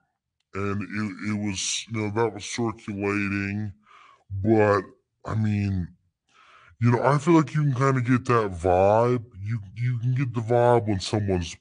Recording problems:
wrong speed and pitch; too slow and too low; 0.7 times normal speed

